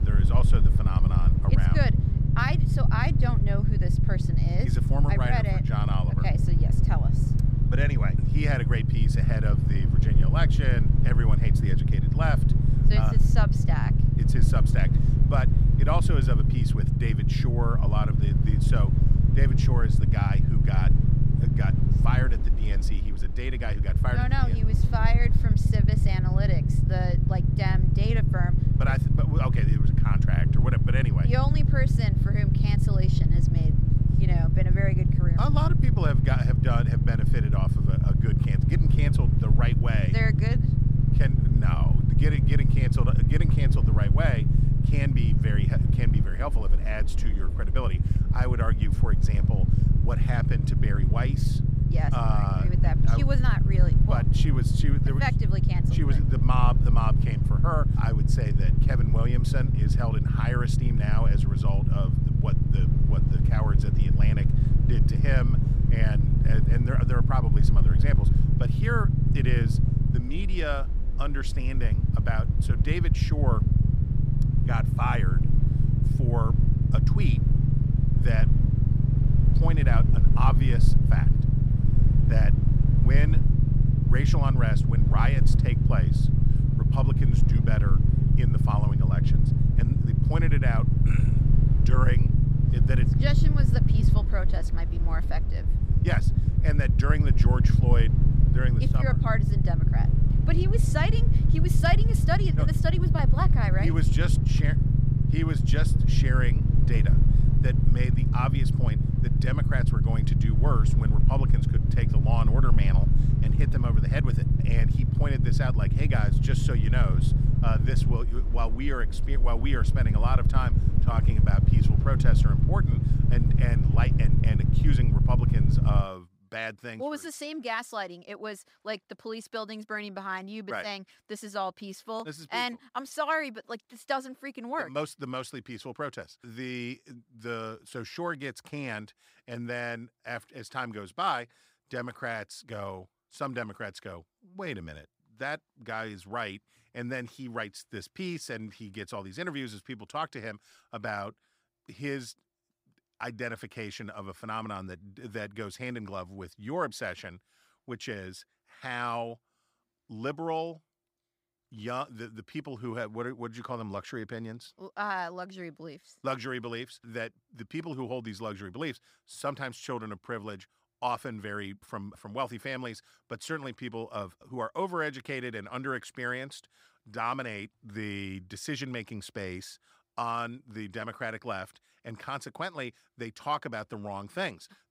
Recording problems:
low rumble; loud; until 2:06; 1 dB below the speech

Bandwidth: 15.5 kHz